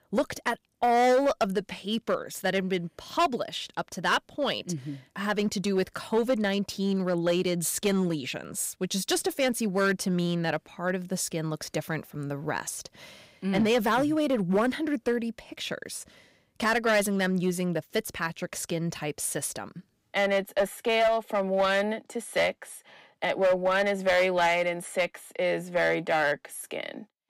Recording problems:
distortion; slight; 5% of the sound clipped

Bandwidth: 15.5 kHz